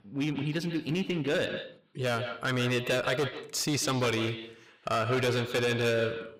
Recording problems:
distortion; heavy; 13% of the sound clipped
echo of what is said; strong; throughout; 140 ms later, 9 dB below the speech

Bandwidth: 15.5 kHz